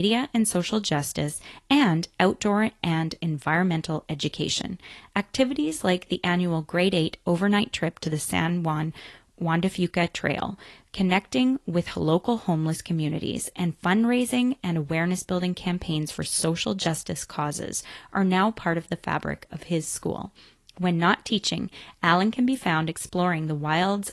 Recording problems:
garbled, watery; slightly; nothing above 11.5 kHz
abrupt cut into speech; at the start

